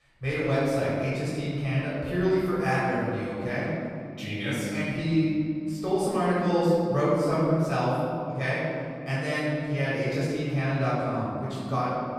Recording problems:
room echo; strong; dies away in 2.8 s
off-mic speech; far

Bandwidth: 14 kHz